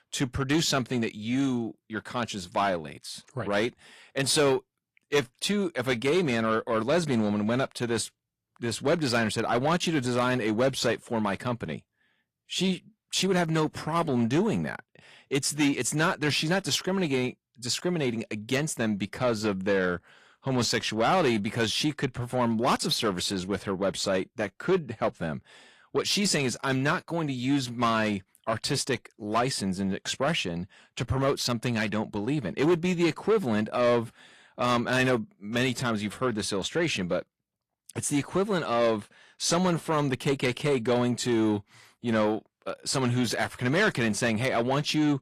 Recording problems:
distortion; slight; 10 dB below the speech
garbled, watery; slightly

